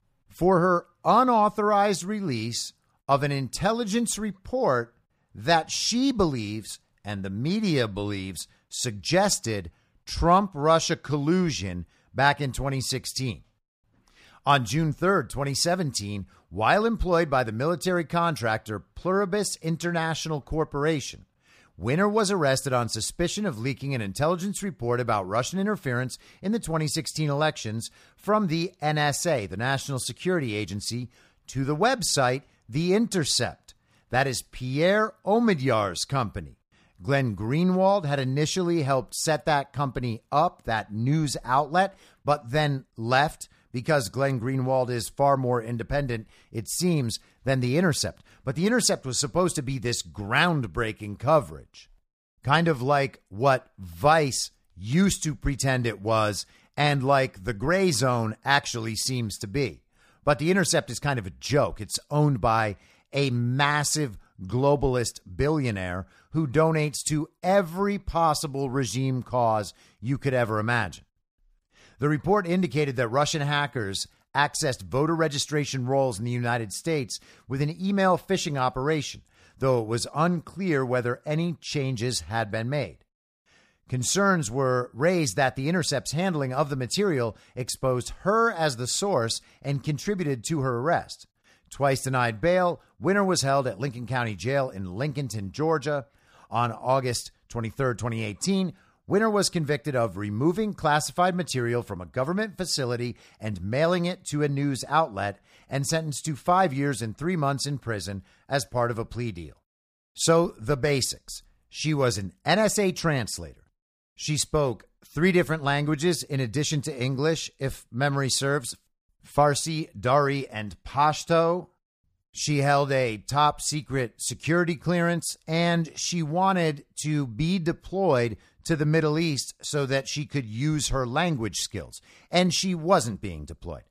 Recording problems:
none

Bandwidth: 15 kHz